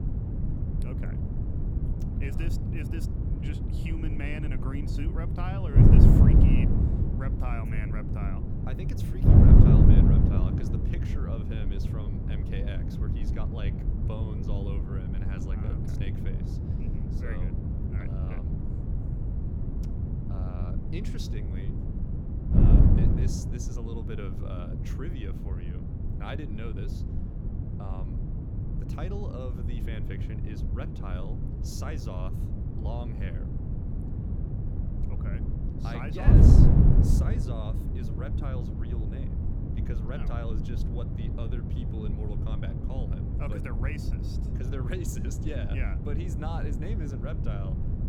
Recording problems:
wind noise on the microphone; heavy; 4 dB above the speech

